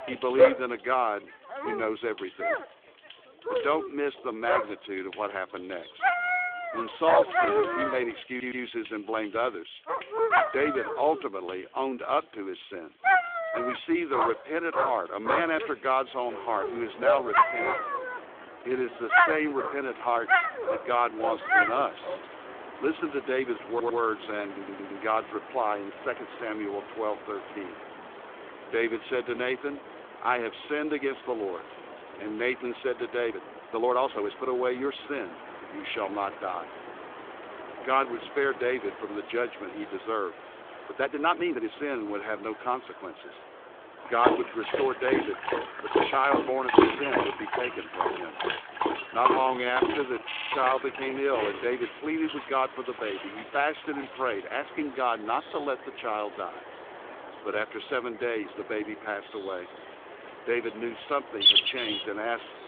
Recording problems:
phone-call audio; nothing above 3.5 kHz
animal sounds; very loud; throughout; 3 dB above the speech
rain or running water; noticeable; throughout; 15 dB below the speech
audio stuttering; 4 times, first at 8.5 s
uneven, jittery; strongly; from 18 to 51 s

